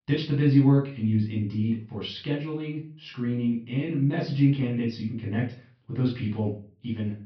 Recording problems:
off-mic speech; far
high frequencies cut off; noticeable; nothing above 5.5 kHz
room echo; slight; dies away in 0.3 s

